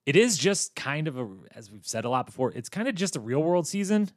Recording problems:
none

